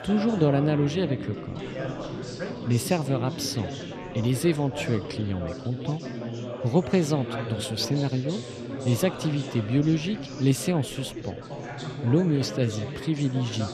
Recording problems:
chatter from many people; loud; throughout; 8 dB below the speech

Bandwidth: 14.5 kHz